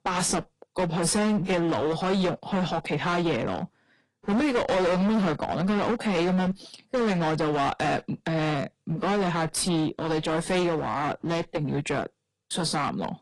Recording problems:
distortion; heavy; 20% of the sound clipped
garbled, watery; slightly; nothing above 10.5 kHz

